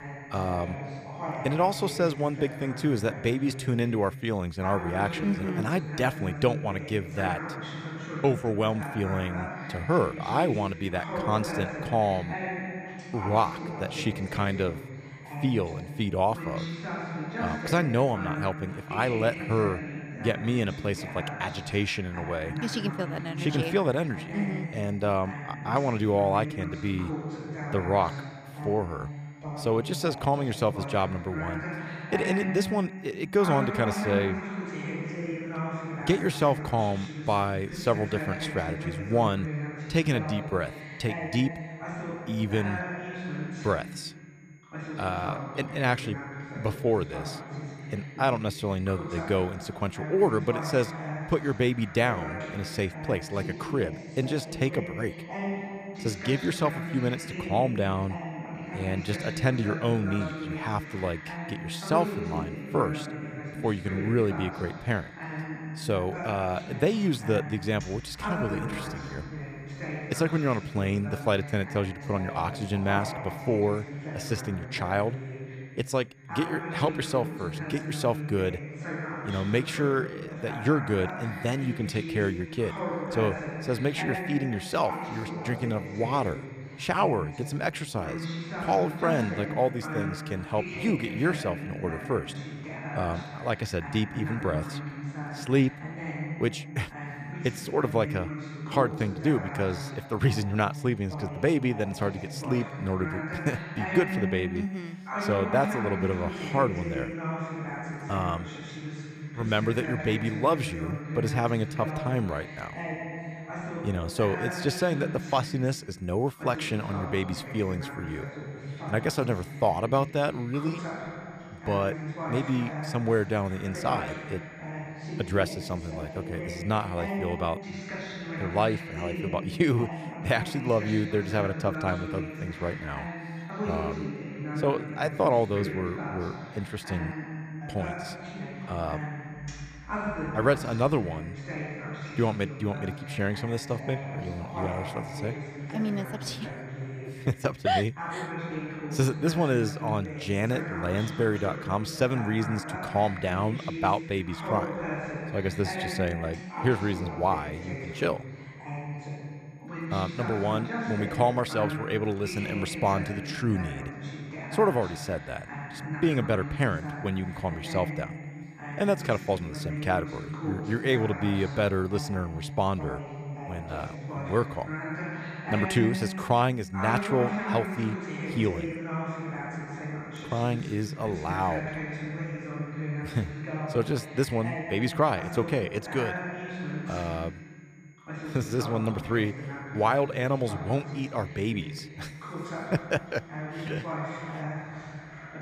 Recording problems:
voice in the background; loud; throughout; 7 dB below the speech
high-pitched whine; faint; throughout; 2 kHz, 35 dB below the speech

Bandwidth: 15 kHz